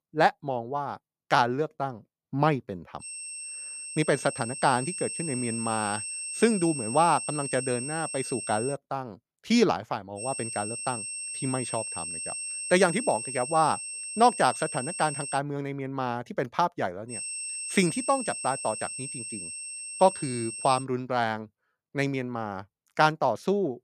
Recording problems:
high-pitched whine; loud; from 3 to 8.5 s, from 10 to 15 s and from 17 to 21 s; 8.5 kHz, 6 dB below the speech

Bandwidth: 15 kHz